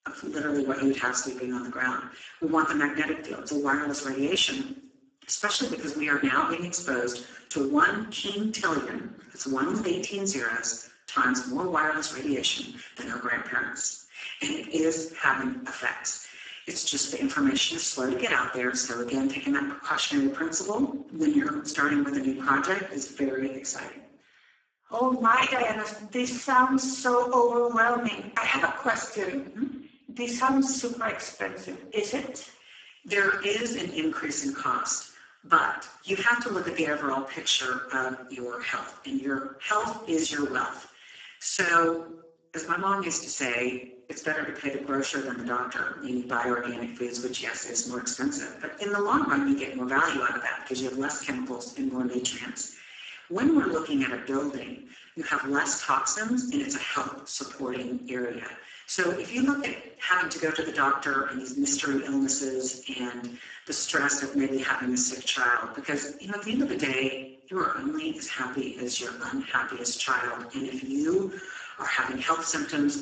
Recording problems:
garbled, watery; badly; nothing above 7.5 kHz
room echo; slight; dies away in 0.5 s
off-mic speech; somewhat distant
thin; very slightly; fading below 250 Hz

